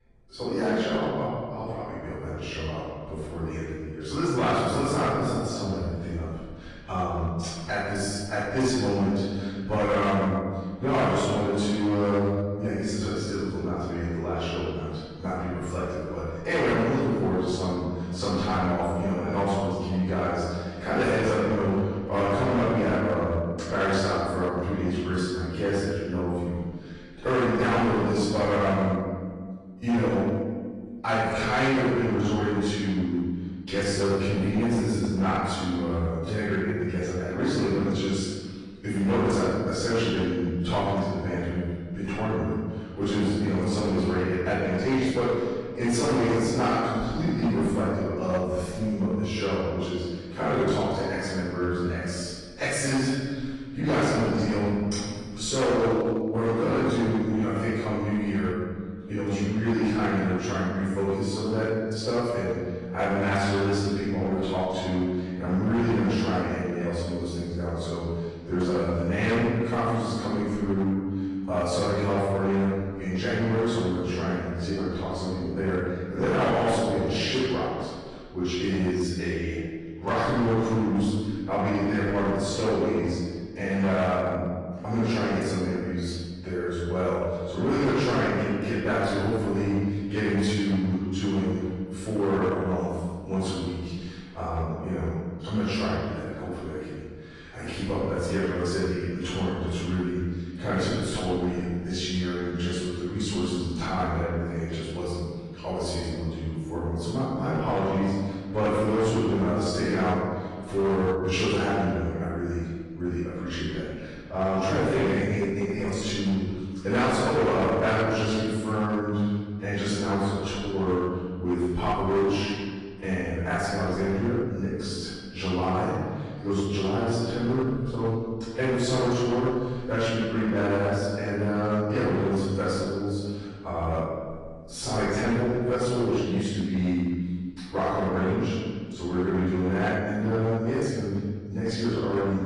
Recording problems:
room echo; strong; dies away in 1.5 s
off-mic speech; far
distortion; slight; 8% of the sound clipped
garbled, watery; slightly; nothing above 10 kHz

